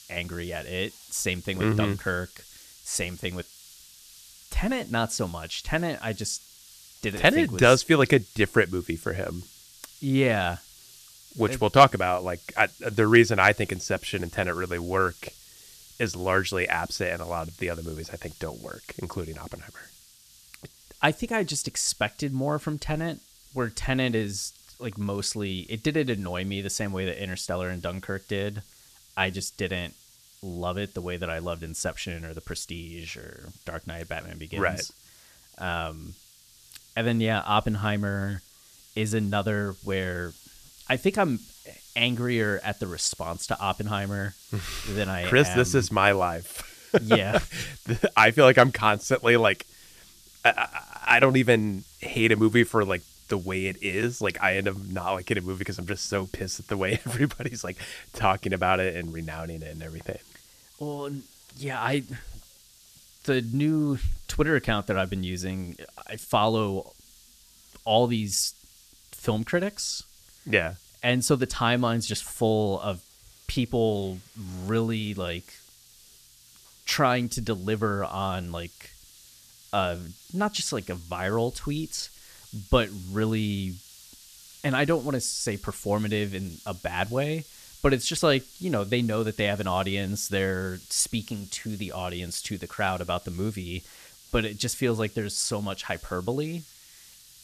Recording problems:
hiss; faint; throughout; 25 dB below the speech

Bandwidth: 14.5 kHz